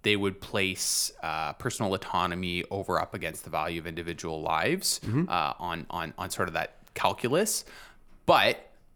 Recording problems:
none

